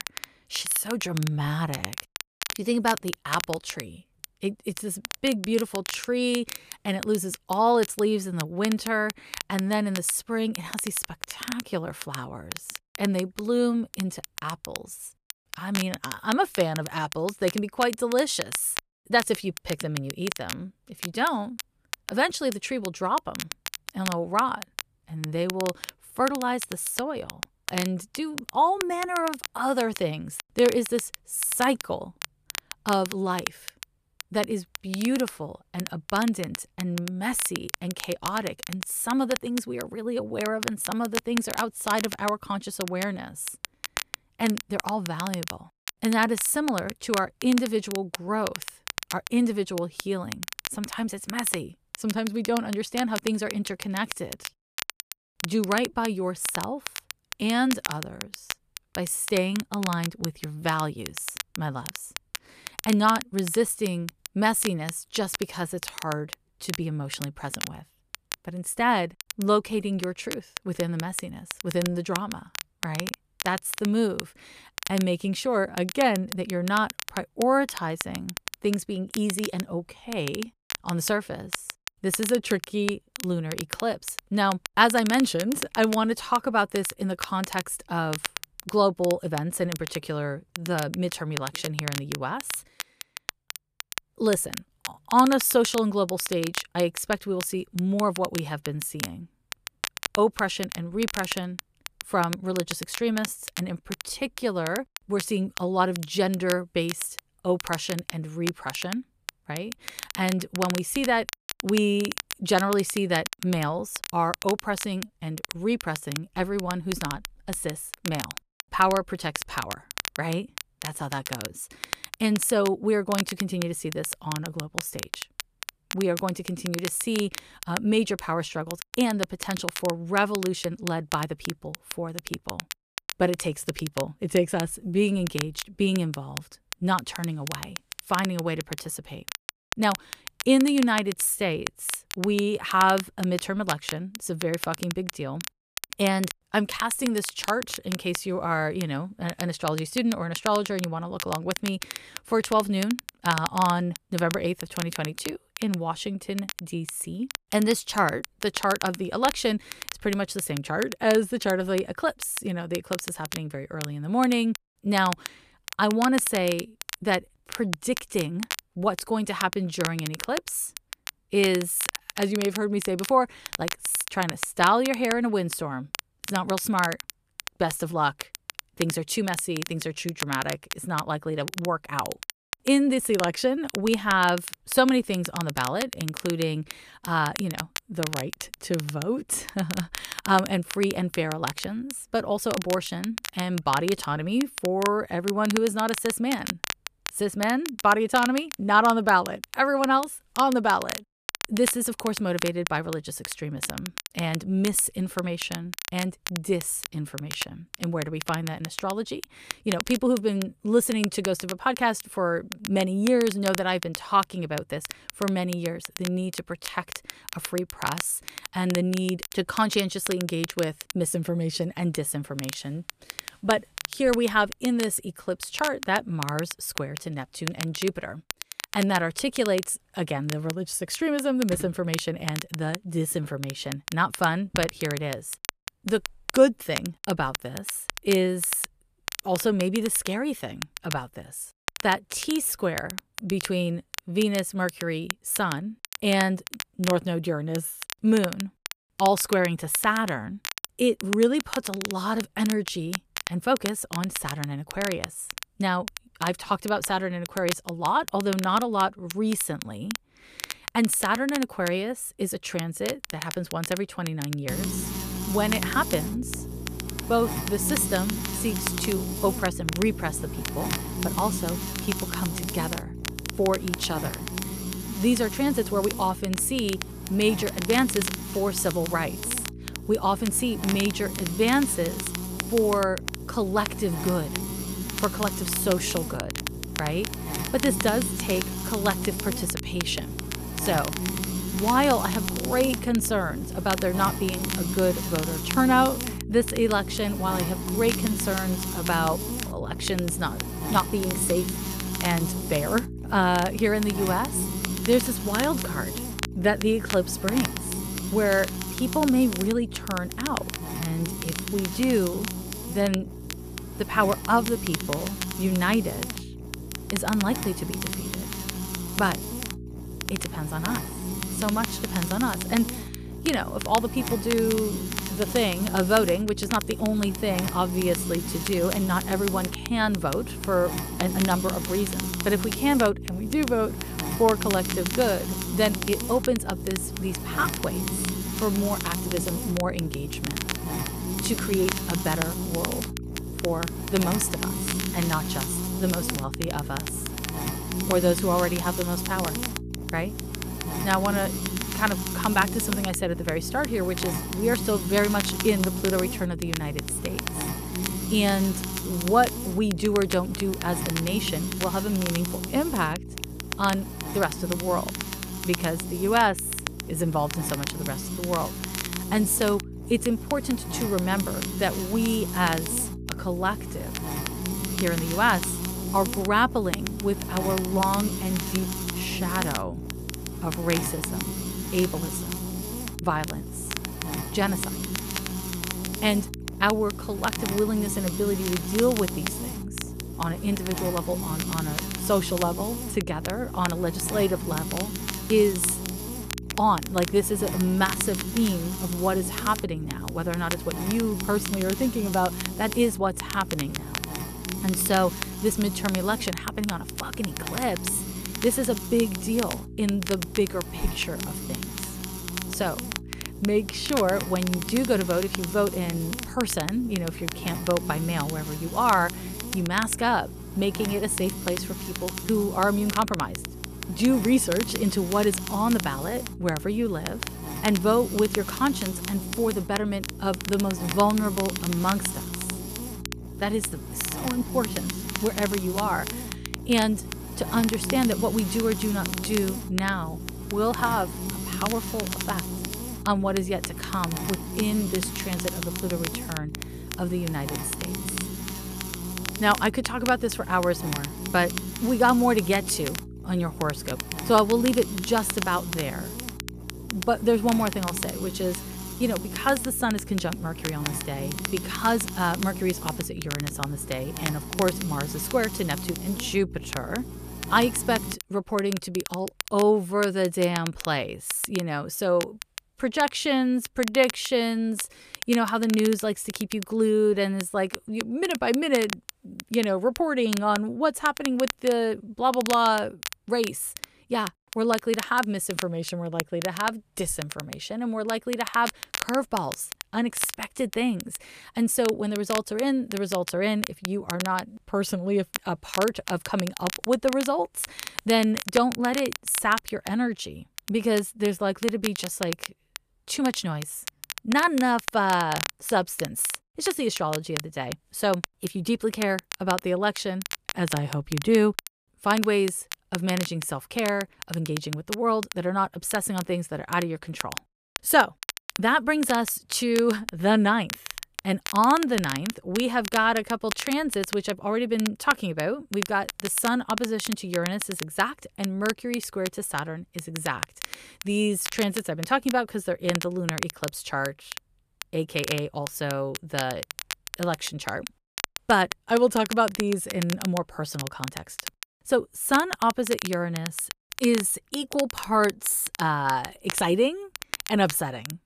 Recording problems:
crackle, like an old record; loud; 10 dB below the speech
electrical hum; noticeable; from 4:24 to 7:48; 60 Hz, 10 dB below the speech

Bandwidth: 14.5 kHz